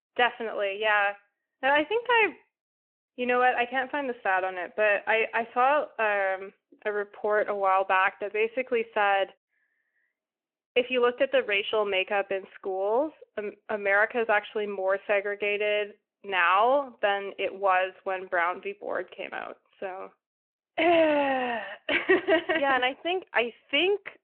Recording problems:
phone-call audio

